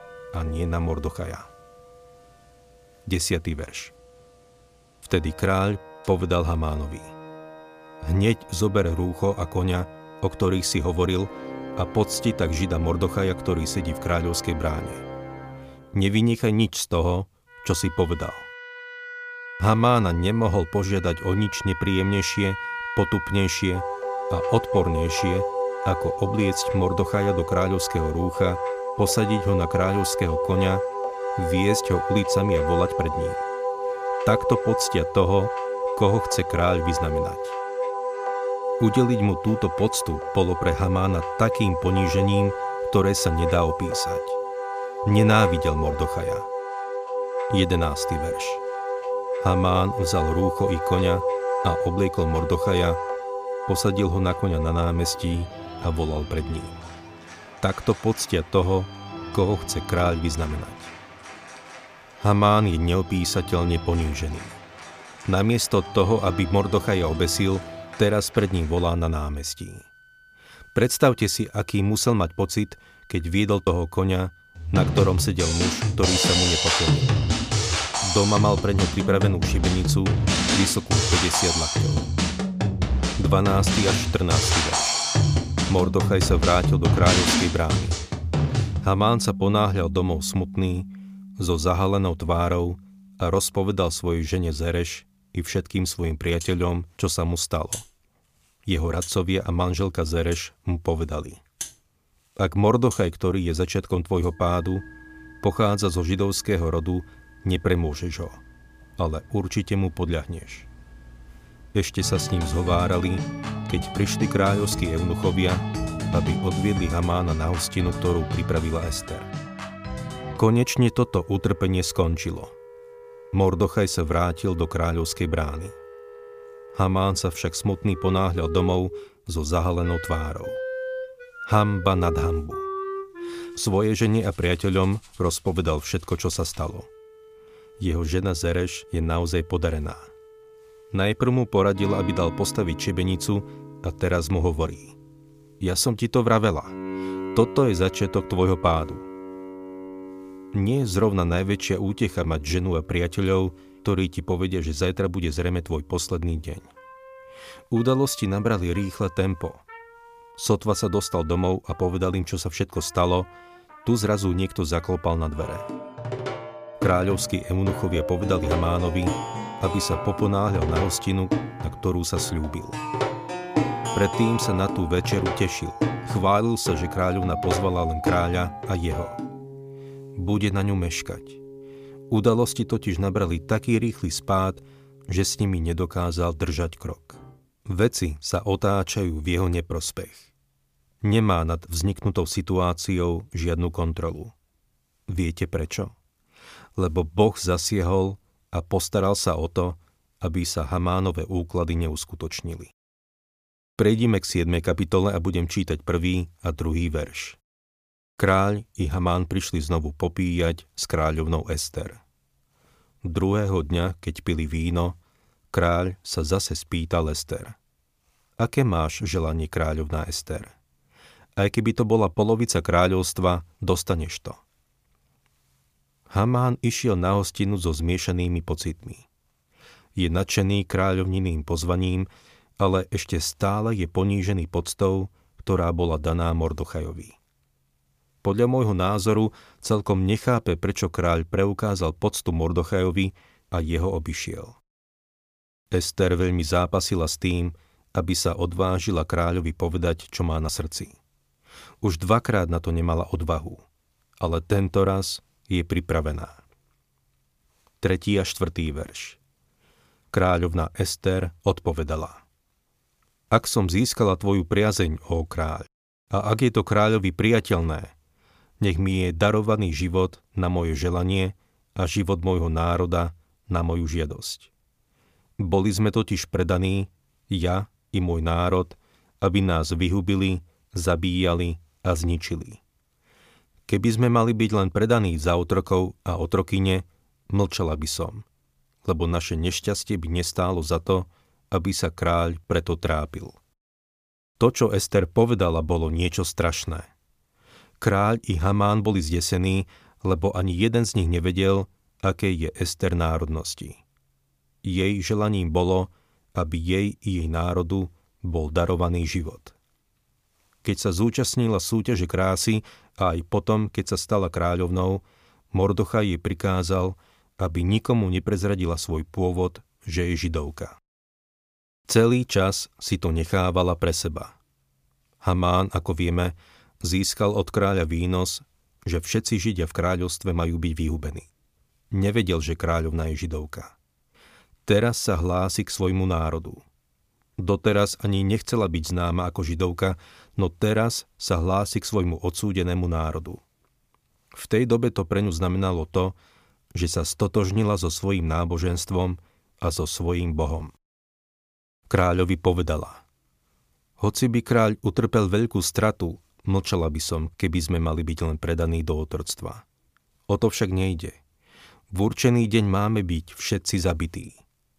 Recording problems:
background music; loud; until 3:07; 4 dB below the speech

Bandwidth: 15 kHz